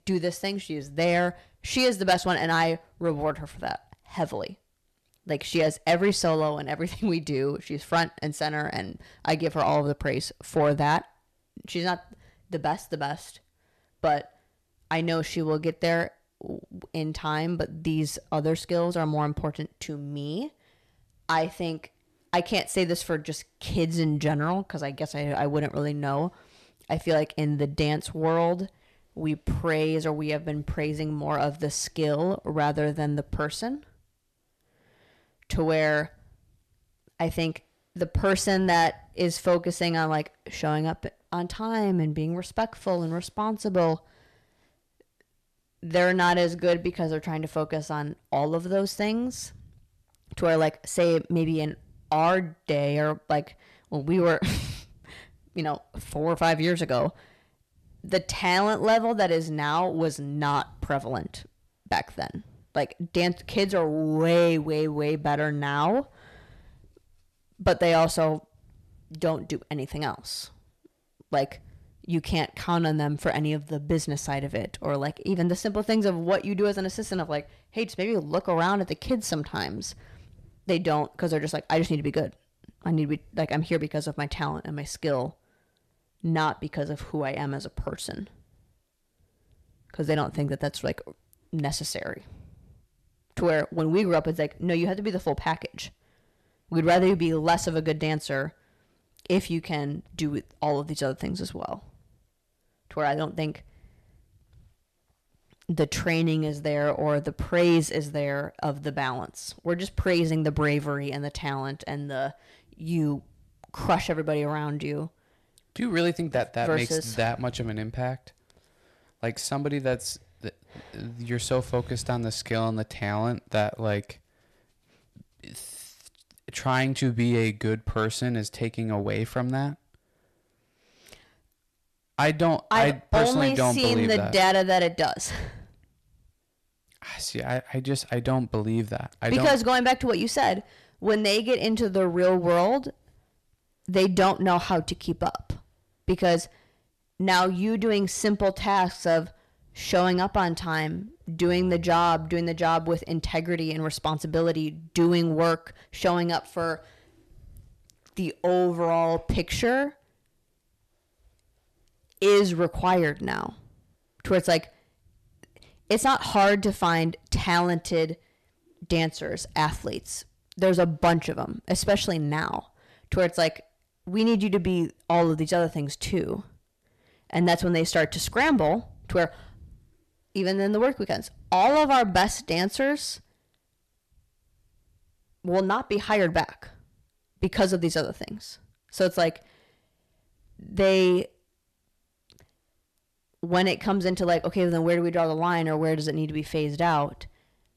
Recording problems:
distortion; slight; 10 dB below the speech

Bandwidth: 13.5 kHz